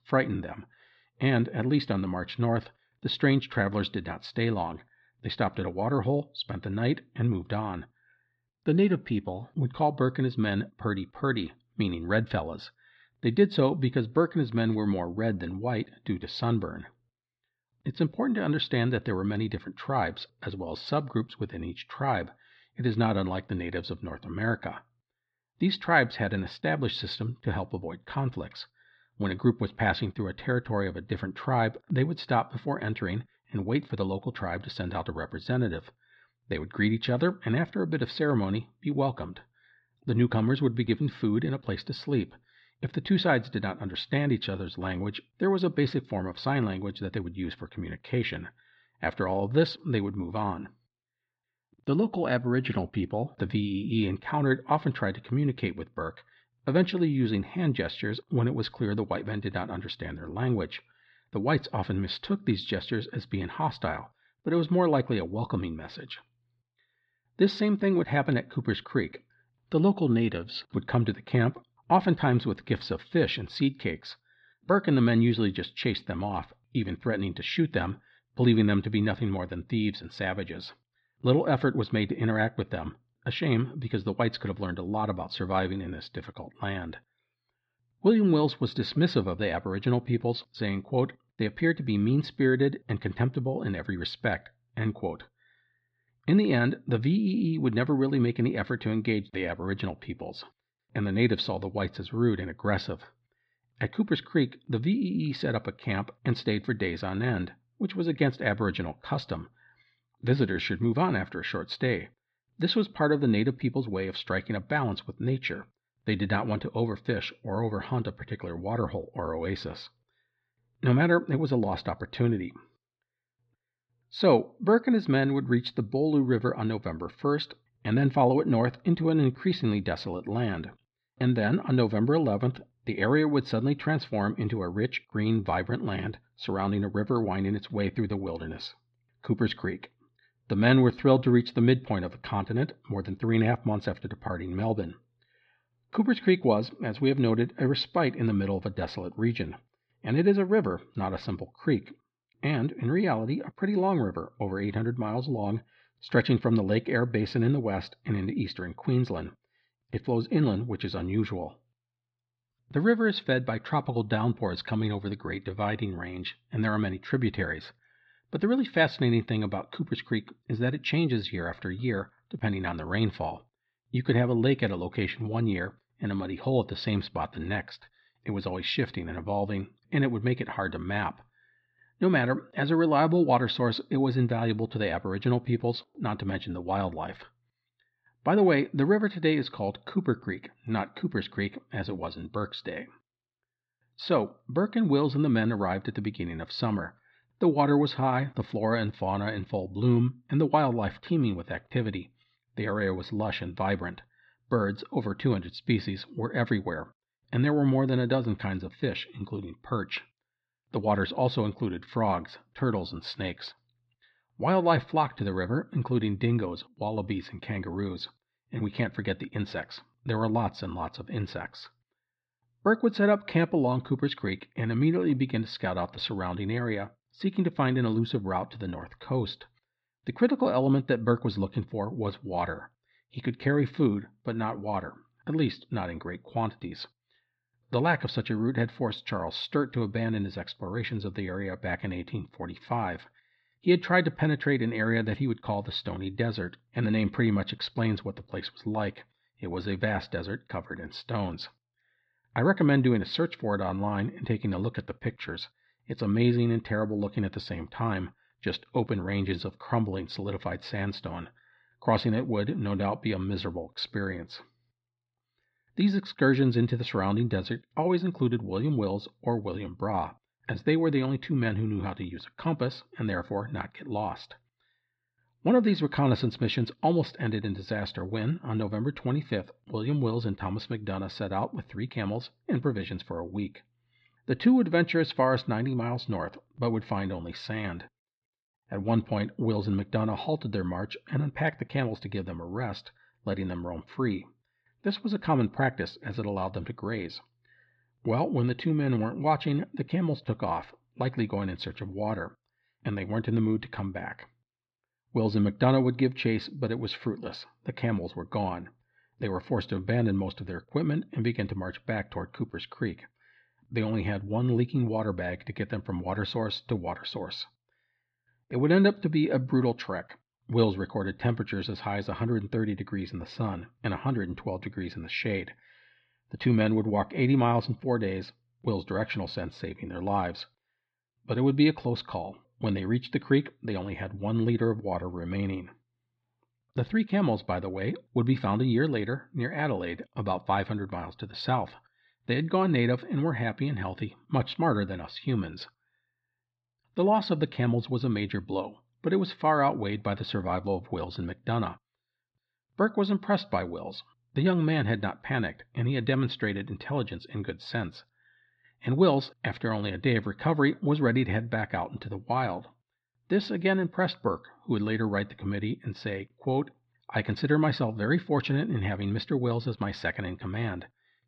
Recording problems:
muffled; very slightly; fading above 4 kHz

